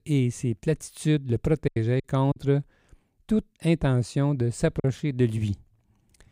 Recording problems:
choppy; very; at 1.5 s and at 5 s; 6% of the speech affected

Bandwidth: 15.5 kHz